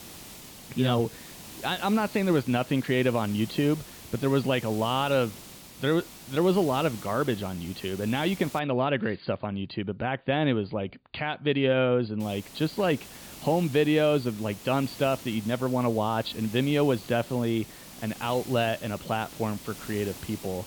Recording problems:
high frequencies cut off; severe; nothing above 5 kHz
hiss; noticeable; until 8.5 s and from 12 s on; 15 dB below the speech

